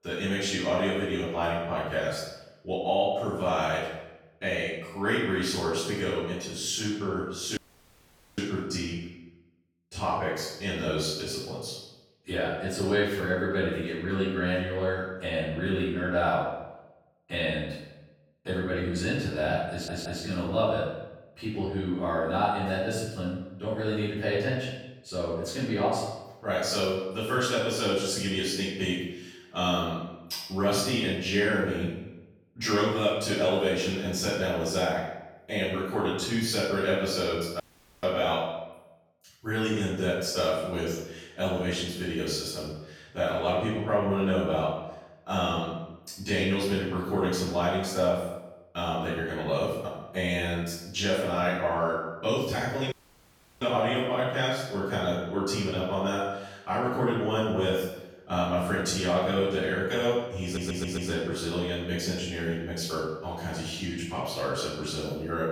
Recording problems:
room echo; strong; dies away in 0.8 s
off-mic speech; far
audio cutting out; at 7.5 s for 1 s, at 38 s and at 53 s for 0.5 s
audio stuttering; at 20 s and at 1:00

